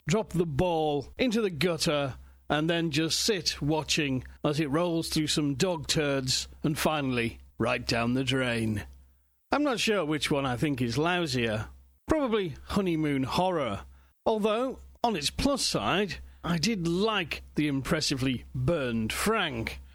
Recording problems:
squashed, flat; heavily

